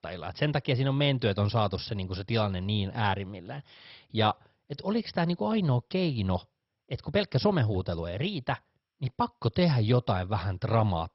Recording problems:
garbled, watery; badly; nothing above 5.5 kHz

